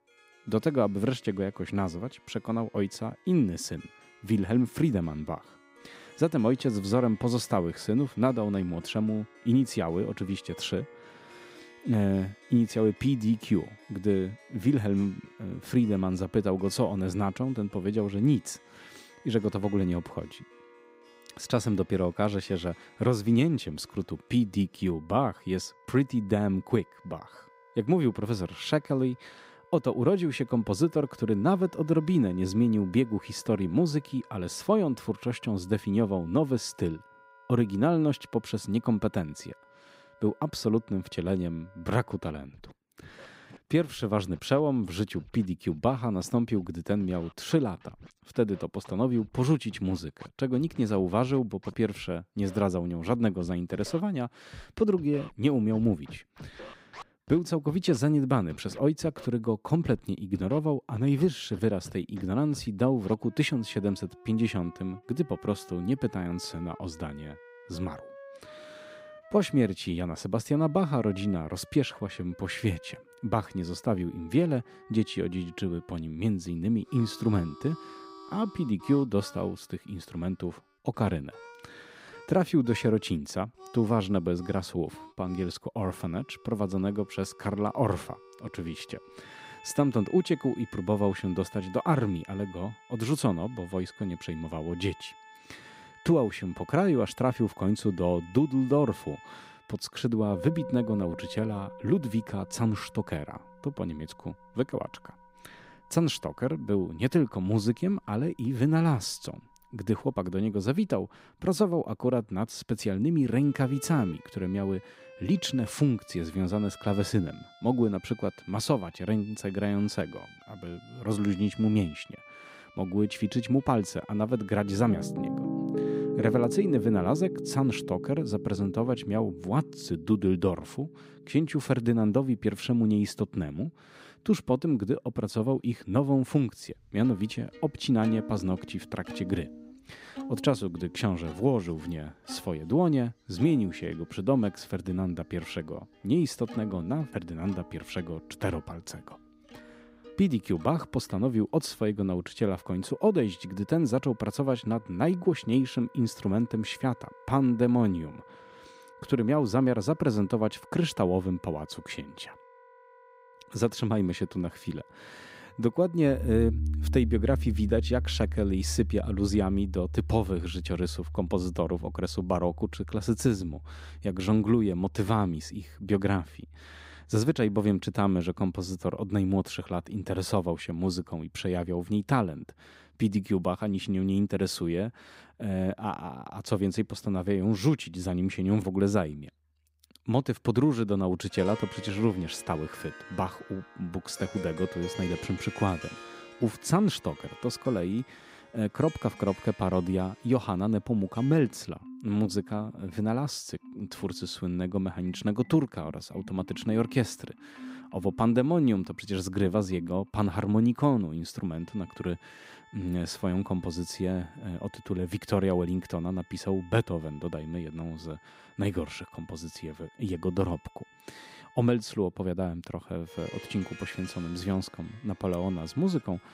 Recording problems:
background music; noticeable; throughout; 15 dB below the speech

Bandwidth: 15.5 kHz